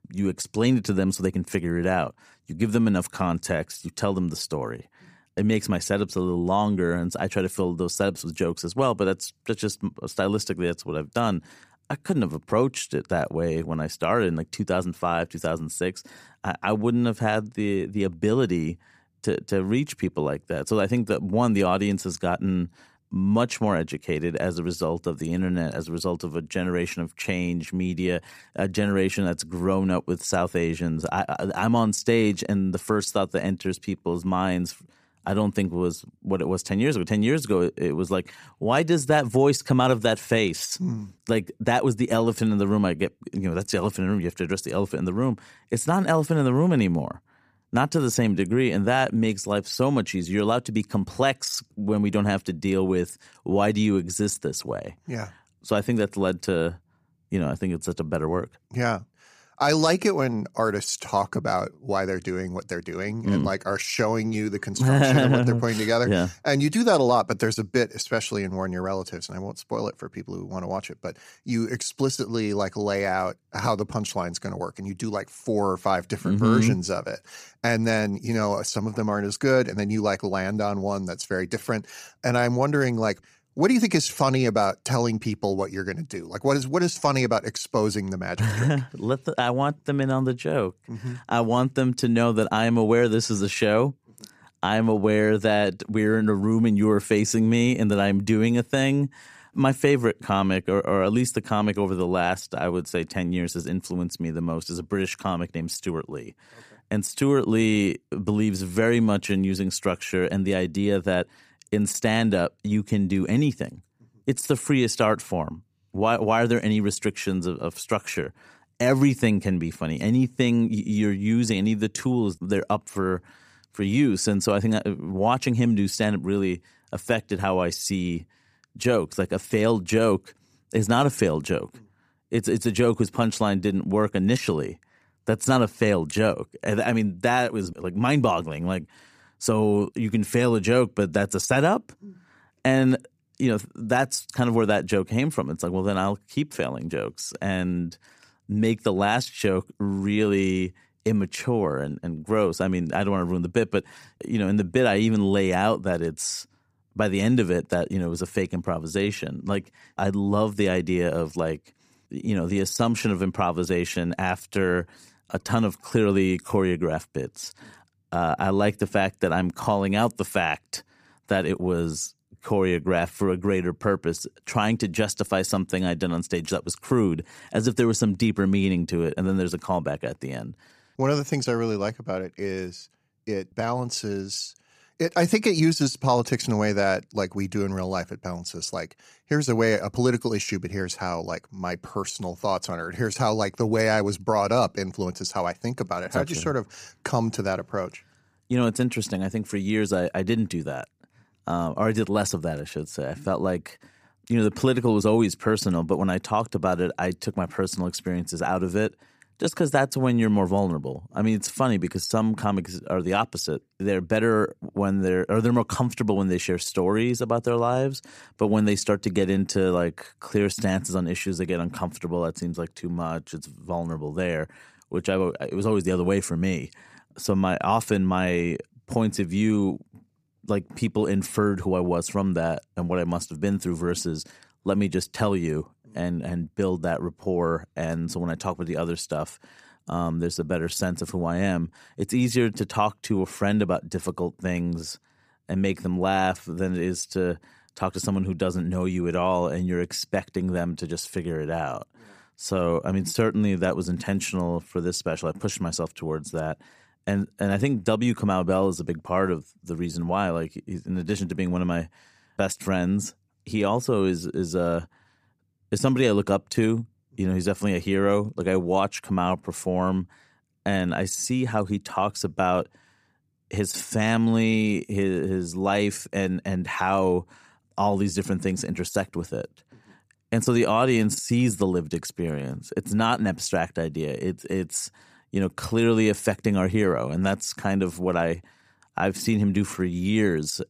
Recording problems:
none

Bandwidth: 15 kHz